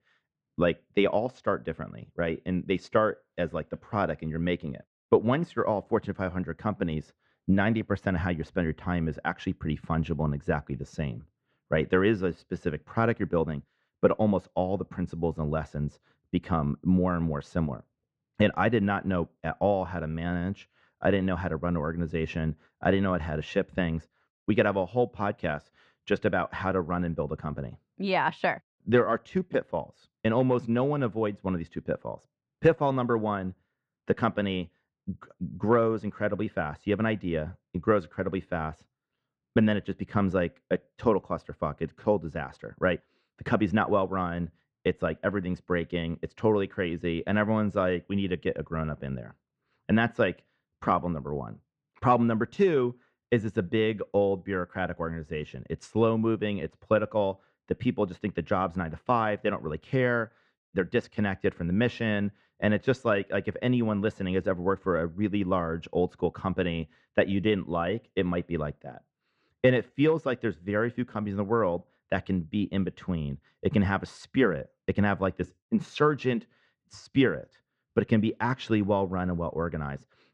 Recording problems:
muffled; very; fading above 2 kHz

